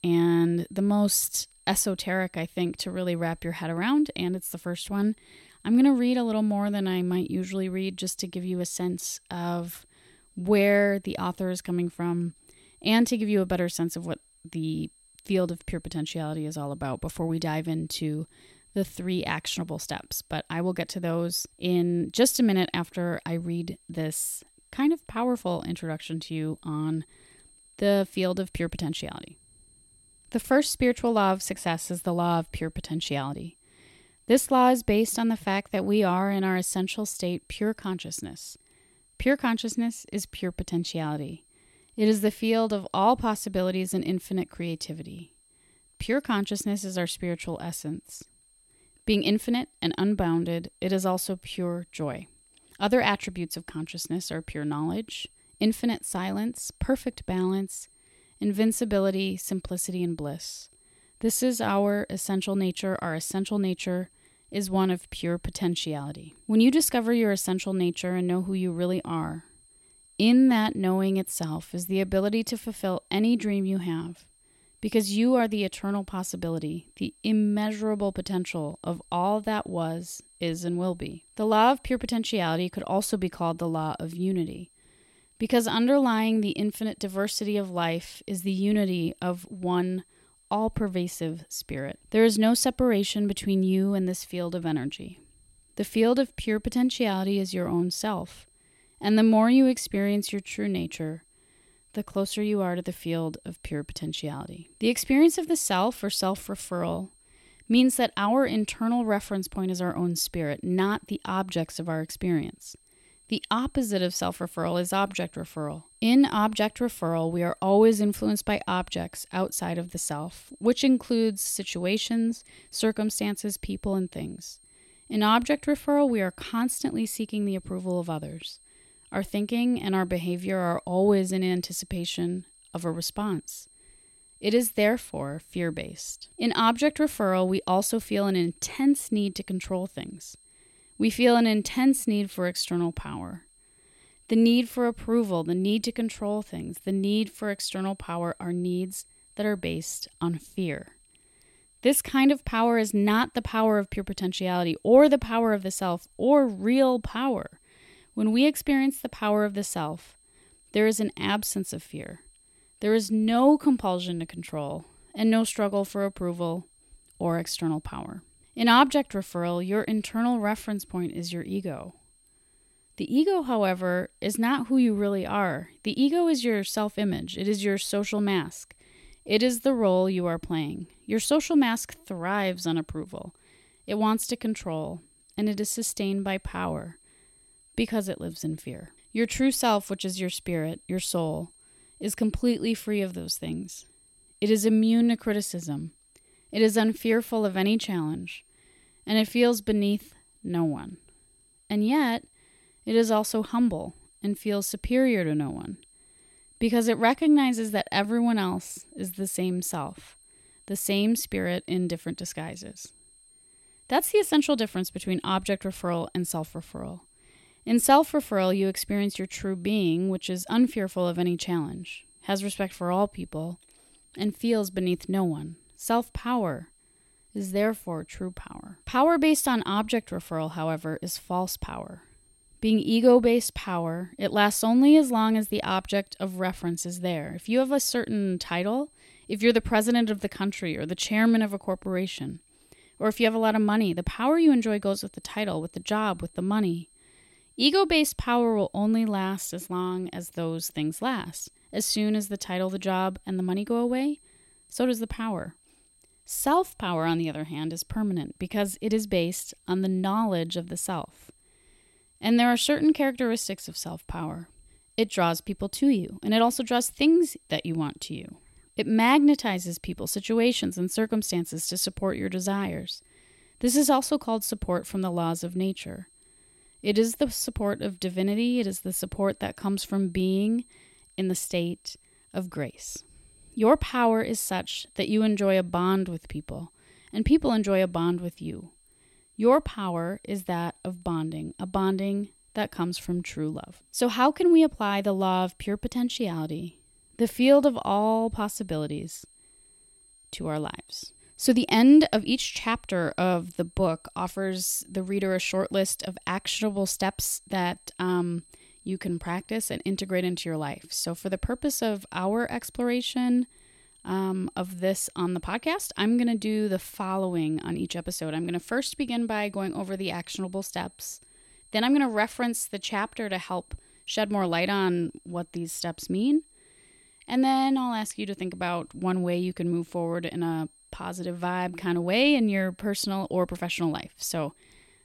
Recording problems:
high-pitched whine; faint; throughout; 8.5 kHz, 30 dB below the speech

